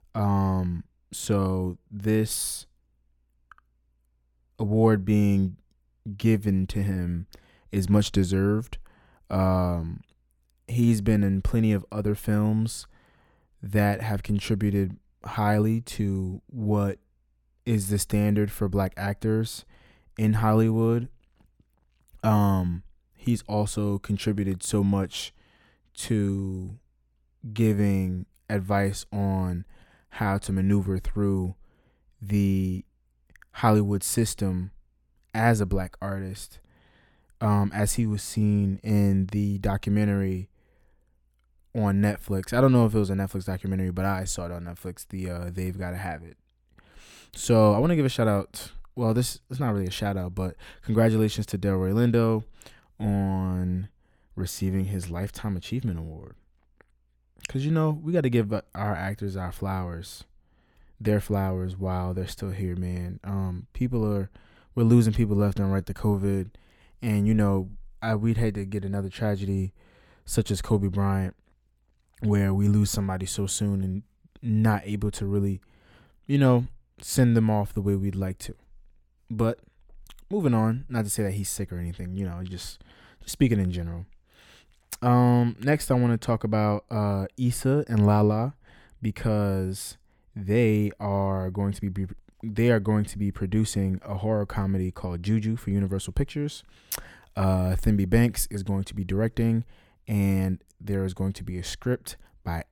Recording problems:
uneven, jittery; slightly; from 27 s to 1:41

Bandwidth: 17.5 kHz